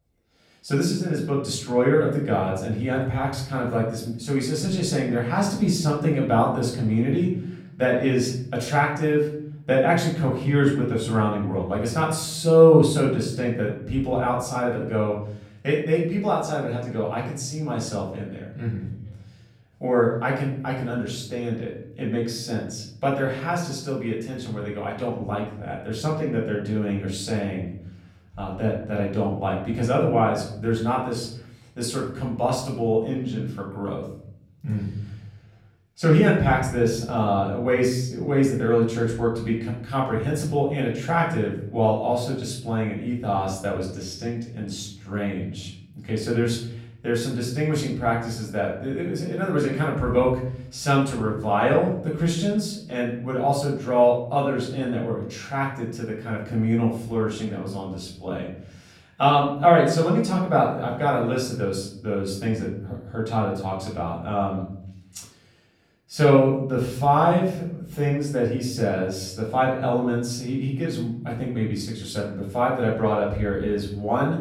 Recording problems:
off-mic speech; far
room echo; noticeable; dies away in 0.9 s

